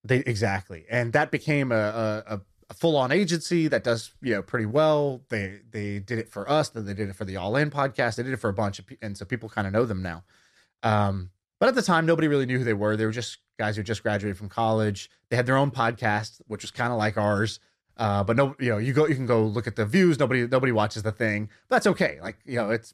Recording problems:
none

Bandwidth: 14.5 kHz